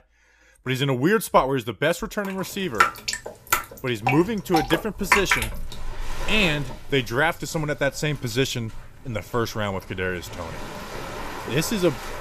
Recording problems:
rain or running water; loud; from 2.5 s on; 2 dB below the speech

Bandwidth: 14.5 kHz